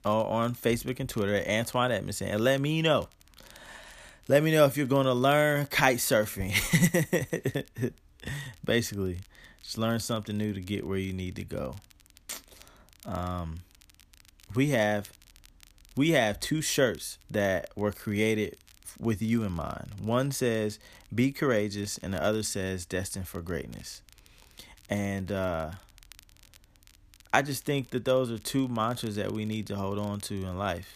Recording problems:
crackle, like an old record; faint; 30 dB below the speech

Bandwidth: 14.5 kHz